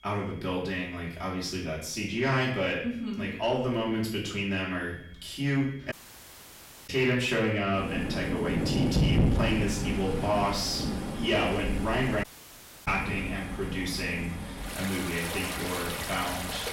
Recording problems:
off-mic speech; far
room echo; noticeable; dies away in 0.6 s
distortion; slight; 10 dB below the speech
rain or running water; loud; from 8 s on; 2 dB below the speech
high-pitched whine; faint; throughout; 3.5 kHz, 30 dB below the speech
audio cutting out; at 6 s for 1 s and at 12 s for 0.5 s

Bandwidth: 16 kHz